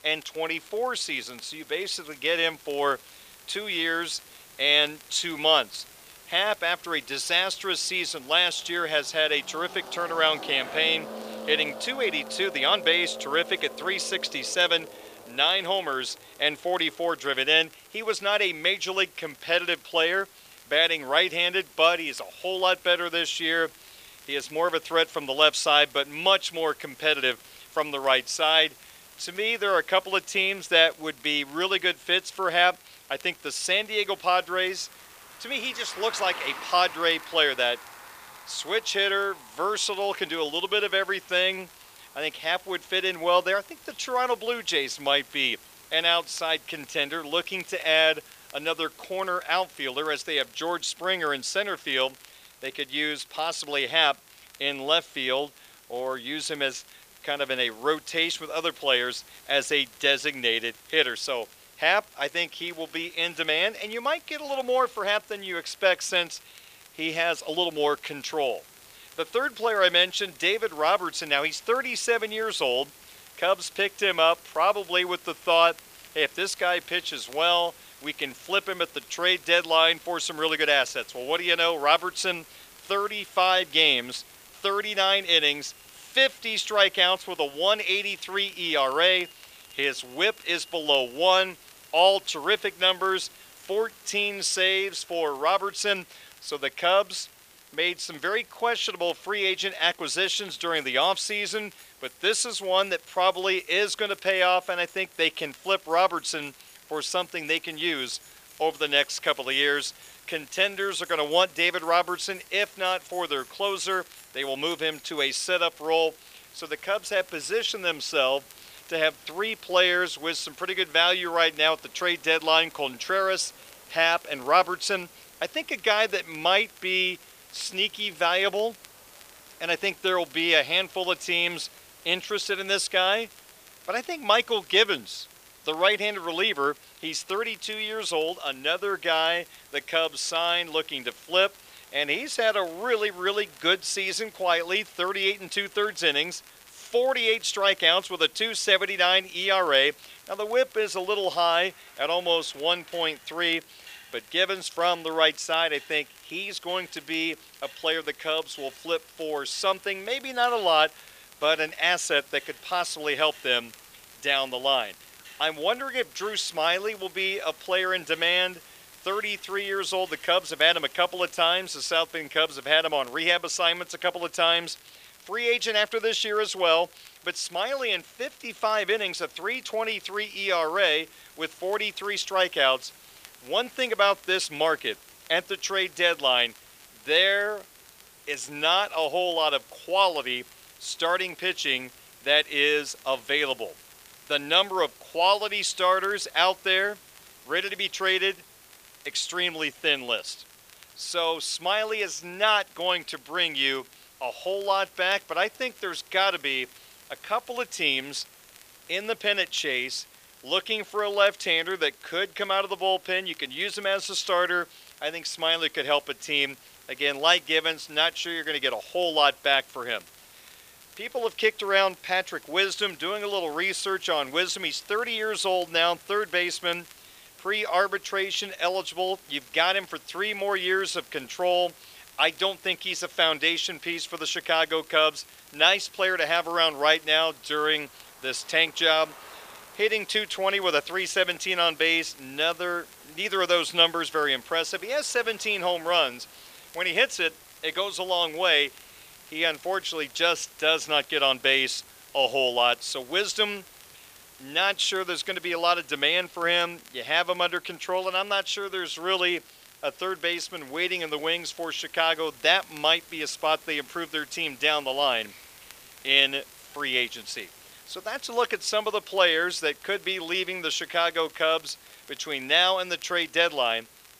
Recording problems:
thin; very; fading below 550 Hz
traffic noise; faint; throughout; 25 dB below the speech
hiss; faint; throughout; 25 dB below the speech
crackle, like an old record; faint; 30 dB below the speech

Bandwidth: 15 kHz